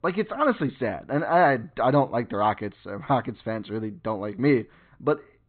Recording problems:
high frequencies cut off; severe; nothing above 4 kHz

